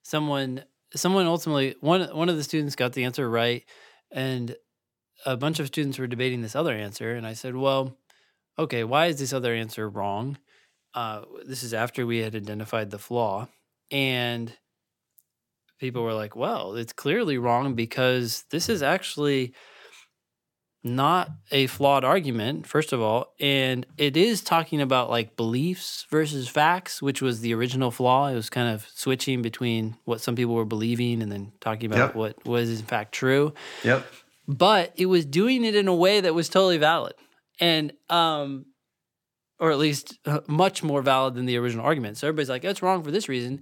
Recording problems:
none

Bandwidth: 17 kHz